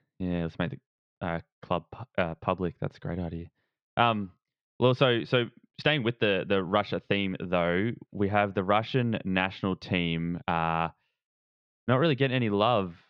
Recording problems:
muffled; very slightly; fading above 4 kHz
uneven, jittery; slightly; from 2 to 12 s

